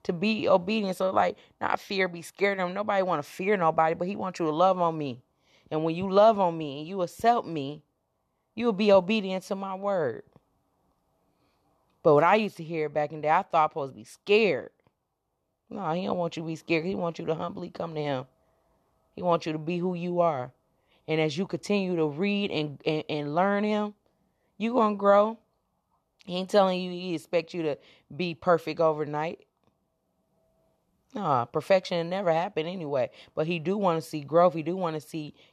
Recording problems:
none

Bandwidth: 13.5 kHz